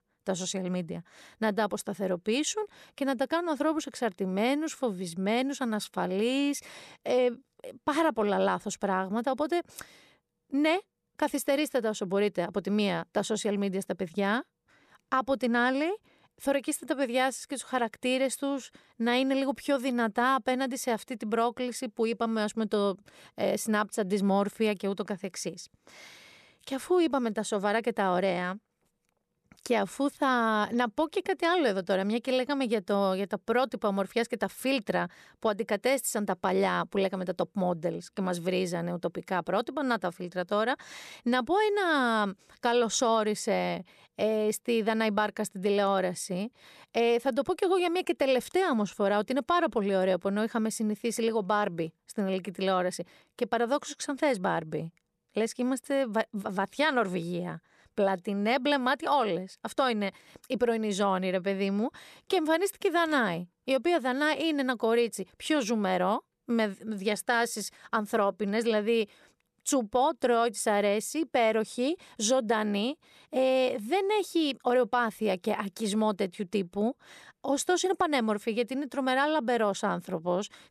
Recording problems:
none

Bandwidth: 13.5 kHz